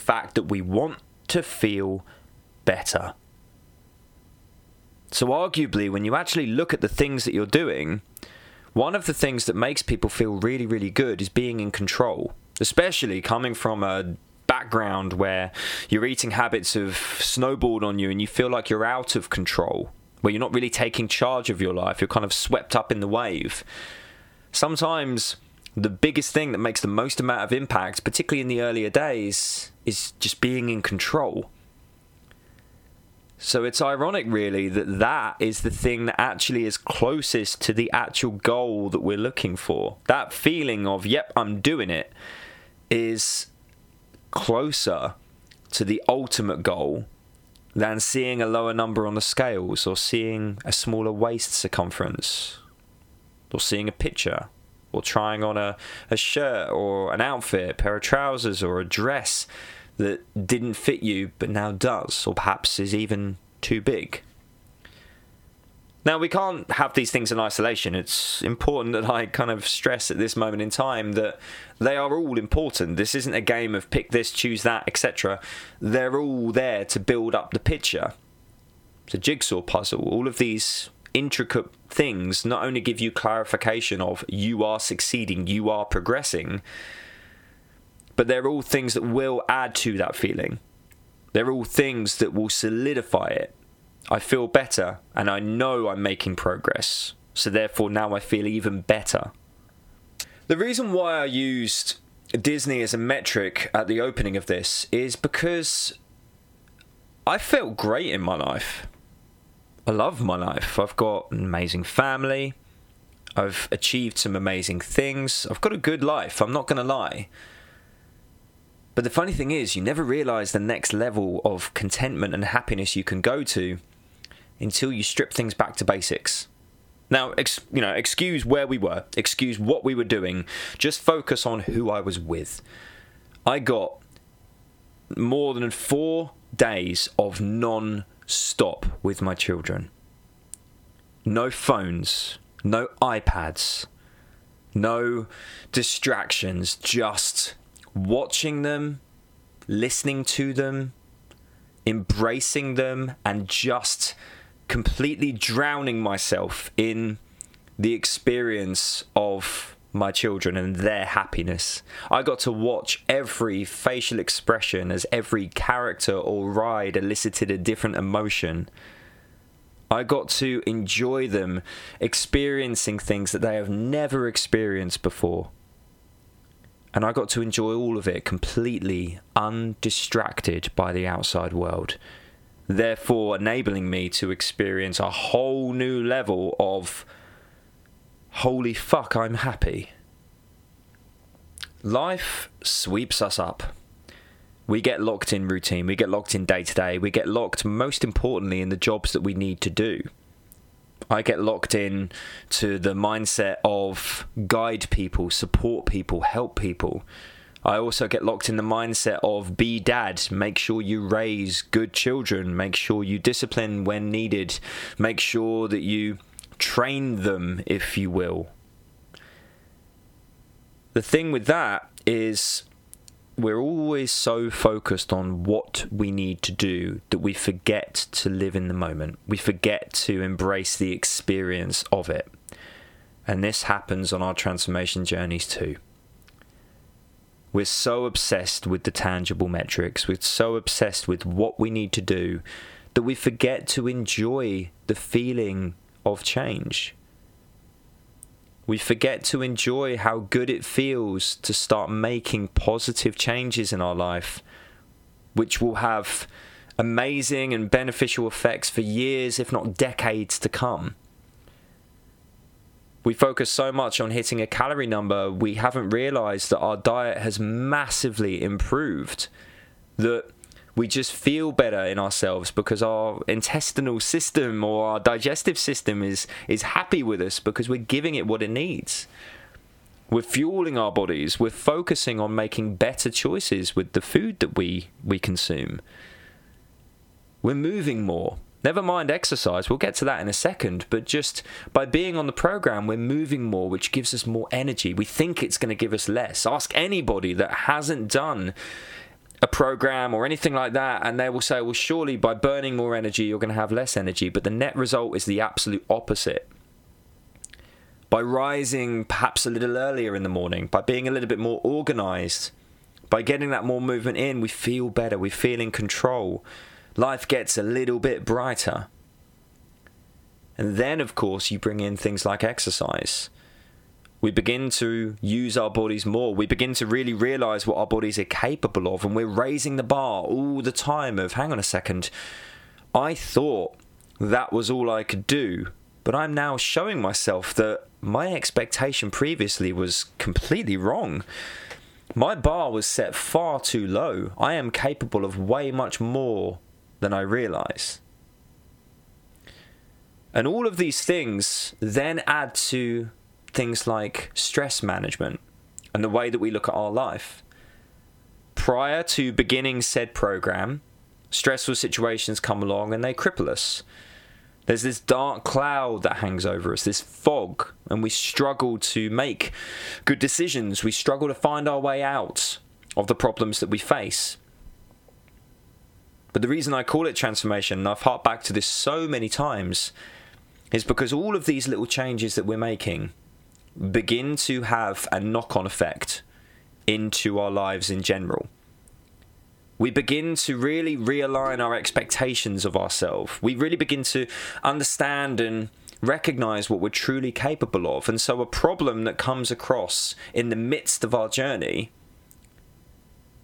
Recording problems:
squashed, flat; heavily

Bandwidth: 18 kHz